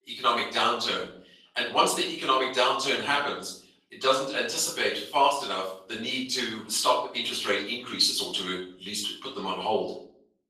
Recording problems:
off-mic speech; far
room echo; noticeable; dies away in 0.5 s
thin; somewhat; fading below 450 Hz
garbled, watery; slightly

